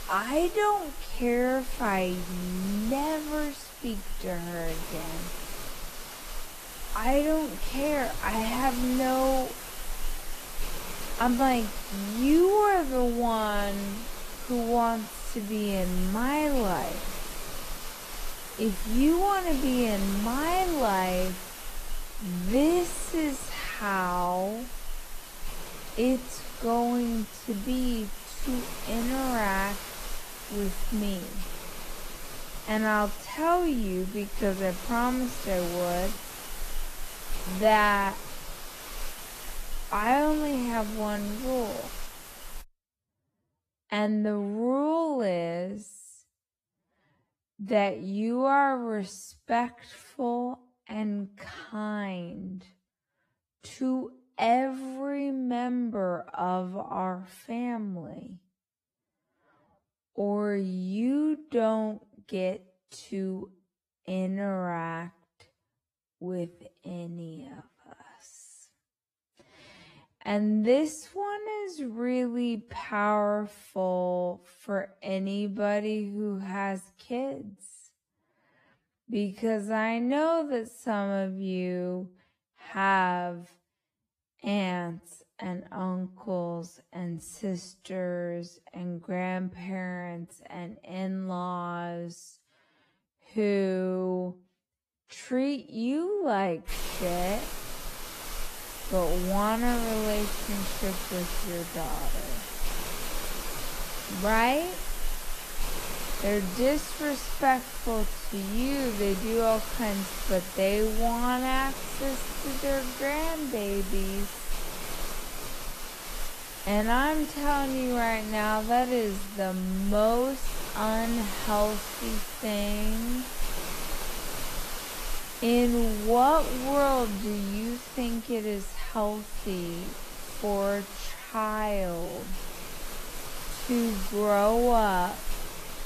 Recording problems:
wrong speed, natural pitch; too slow; 0.5 times normal speed
garbled, watery; slightly; nothing above 14.5 kHz
hiss; loud; until 43 s and from 1:37 on; 9 dB below the speech

